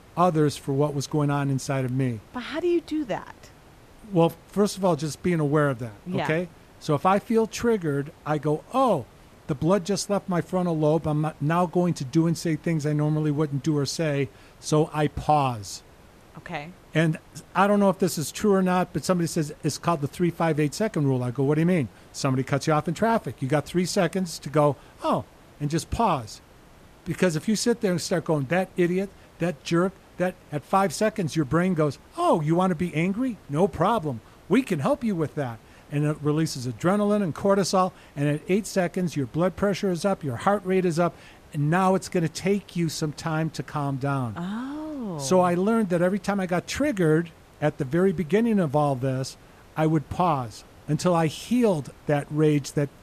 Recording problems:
hiss; faint; throughout; 25 dB below the speech

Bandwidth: 14.5 kHz